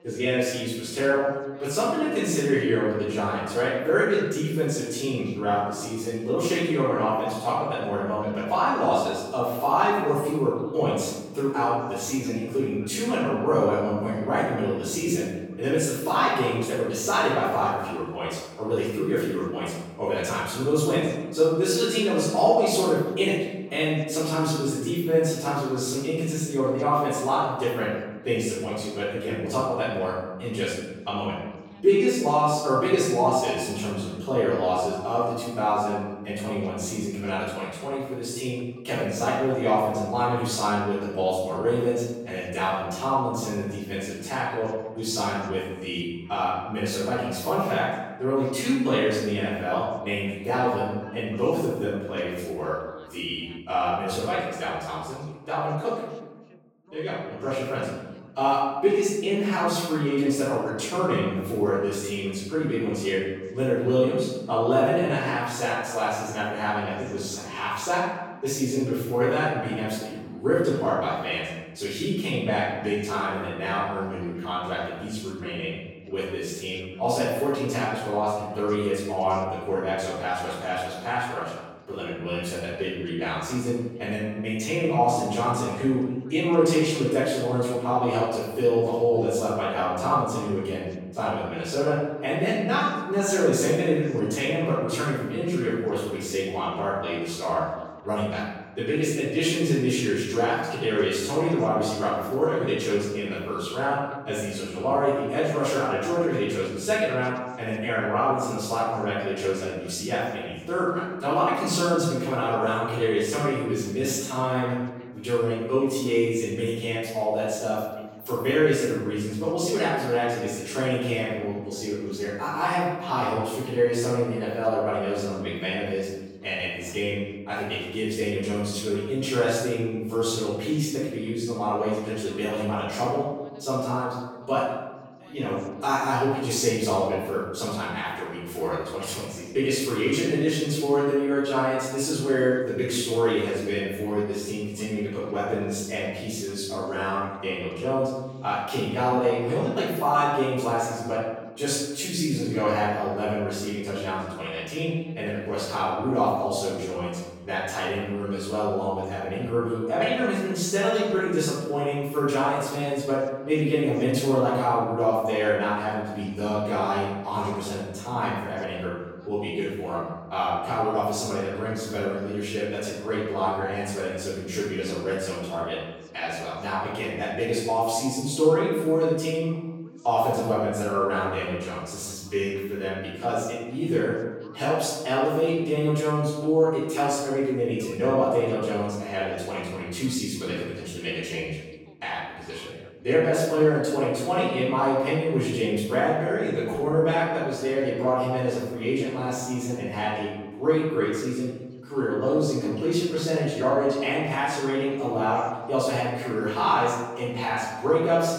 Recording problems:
room echo; strong; dies away in 1.1 s
off-mic speech; far
background chatter; faint; throughout; 2 voices, 25 dB below the speech

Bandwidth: 17 kHz